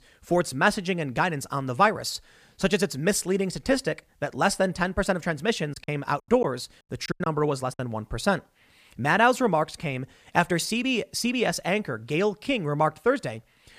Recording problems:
choppy; very; from 5.5 to 7.5 s; 13% of the speech affected

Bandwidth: 15 kHz